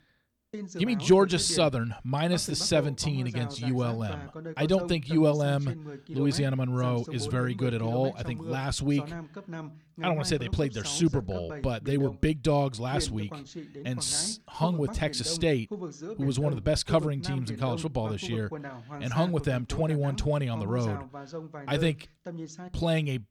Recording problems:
voice in the background; noticeable; throughout; 10 dB below the speech

